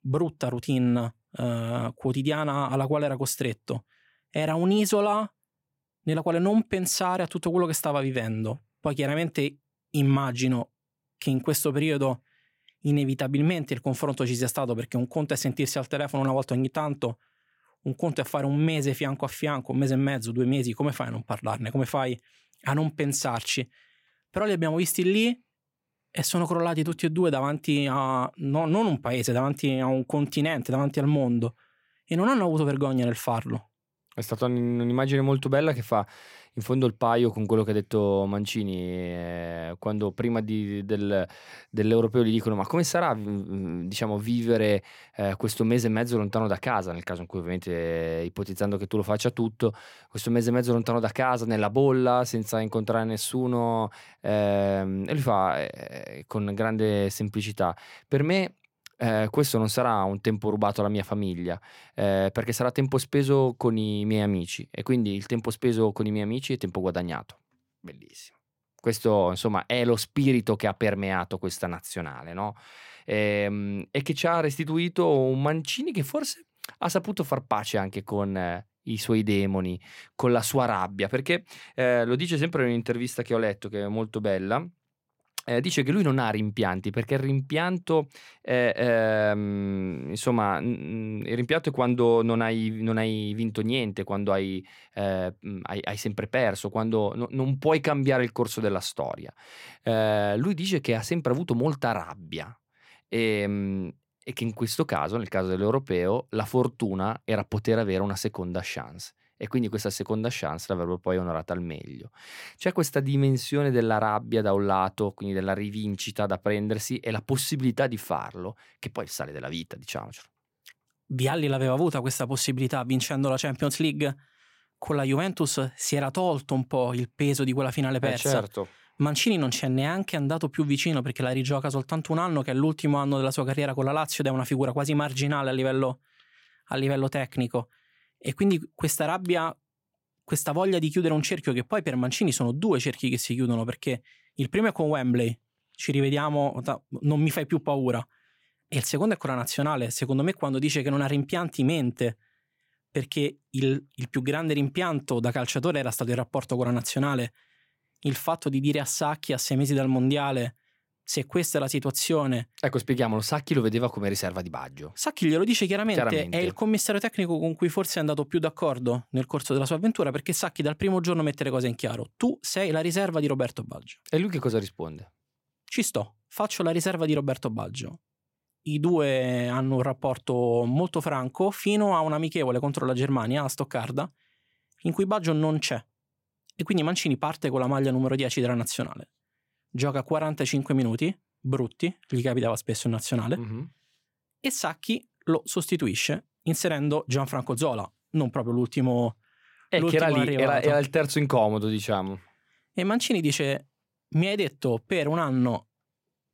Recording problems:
none

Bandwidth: 16.5 kHz